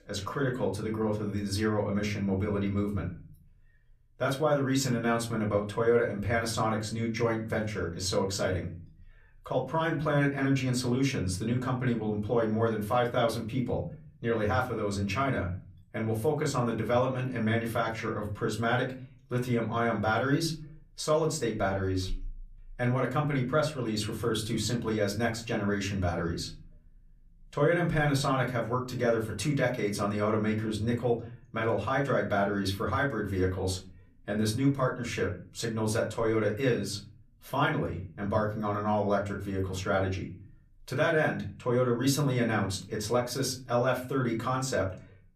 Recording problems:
off-mic speech; far
room echo; very slight; dies away in 0.4 s

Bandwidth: 14.5 kHz